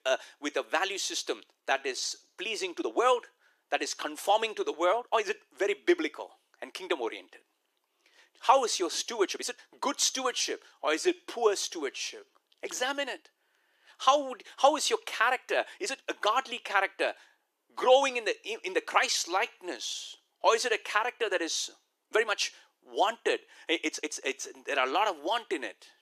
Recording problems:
thin; somewhat; fading below 350 Hz
uneven, jittery; strongly; from 1.5 to 24 s

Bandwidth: 14.5 kHz